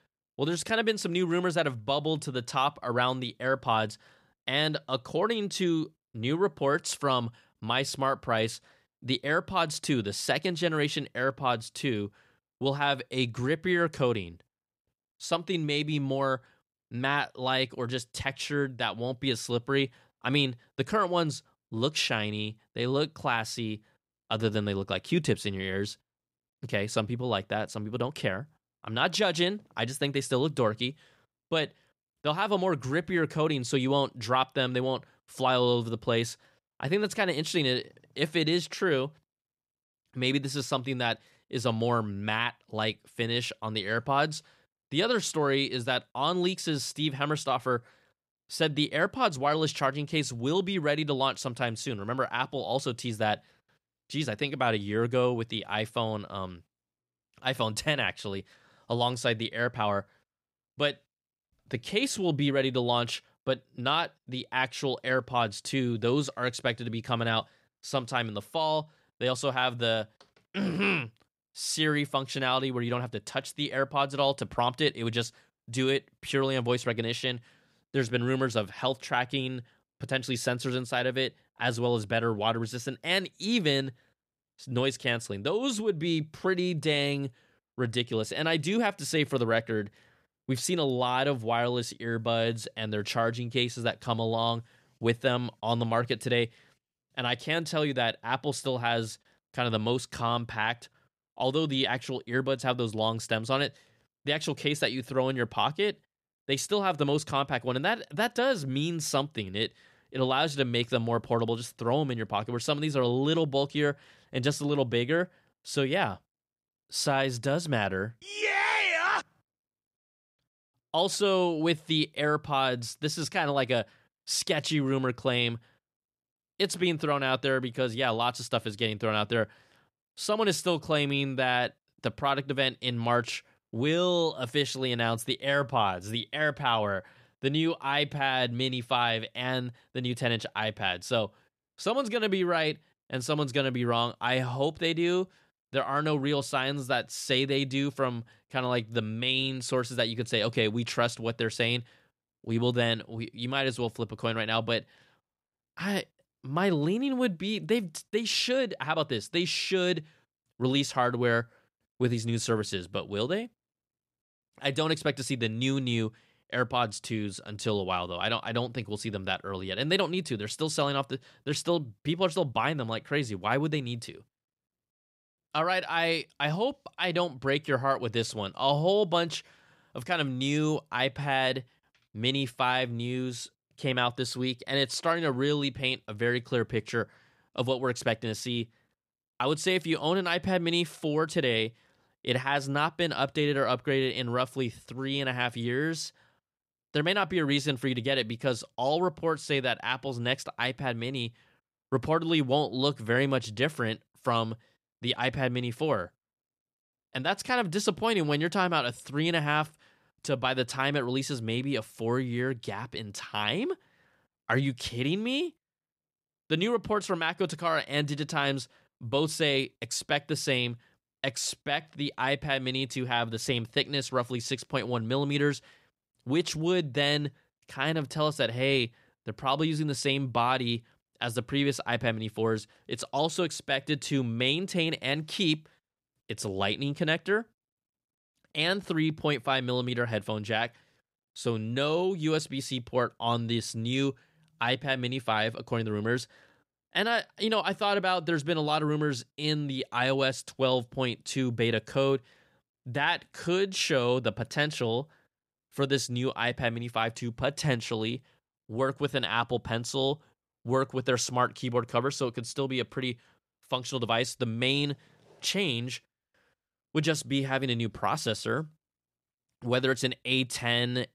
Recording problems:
none

